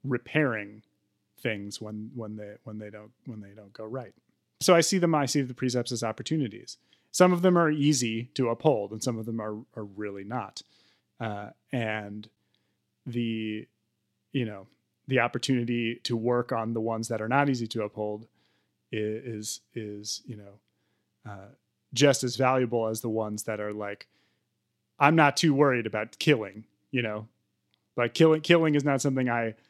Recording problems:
none

